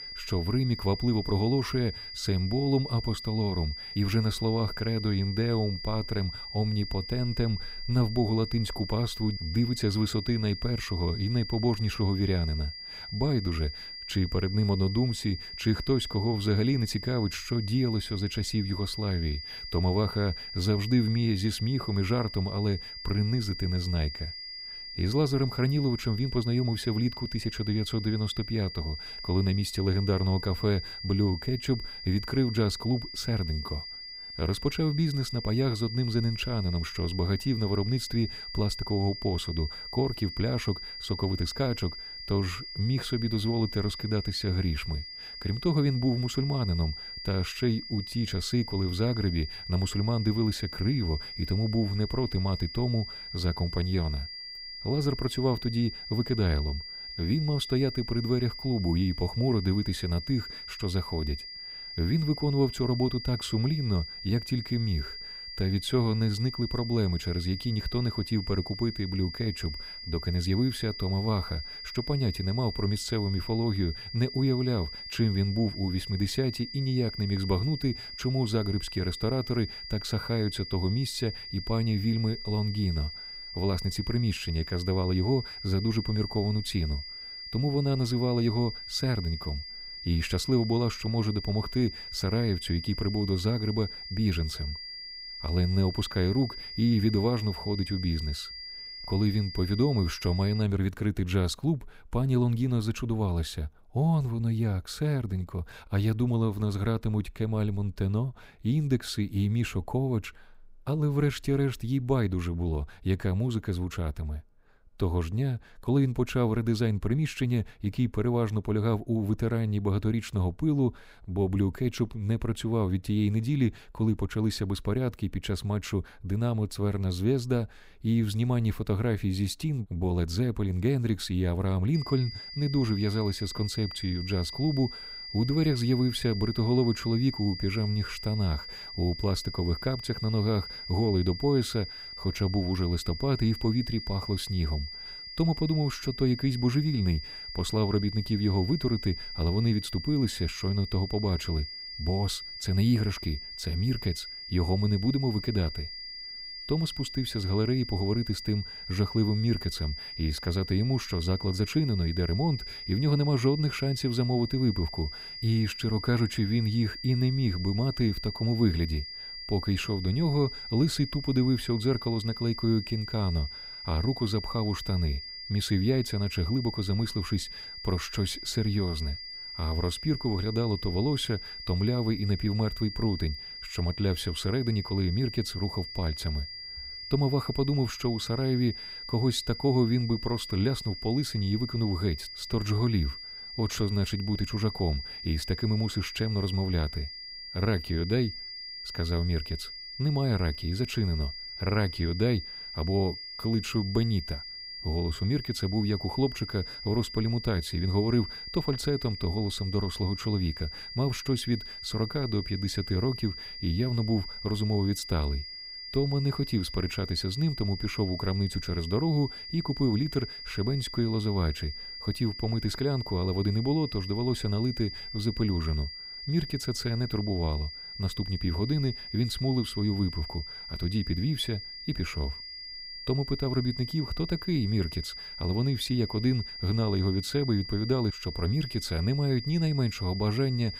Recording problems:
high-pitched whine; loud; until 1:41 and from 2:12 on; 5 kHz, 9 dB below the speech

